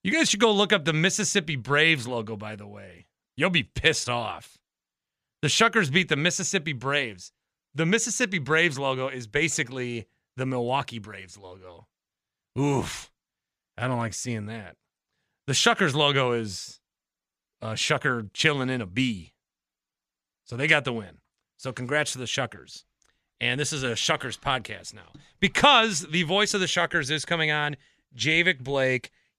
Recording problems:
none

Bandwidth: 14.5 kHz